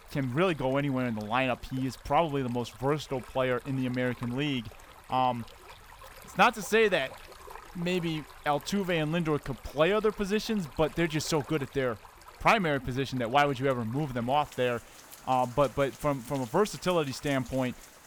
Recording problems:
rain or running water; noticeable; throughout; 20 dB below the speech

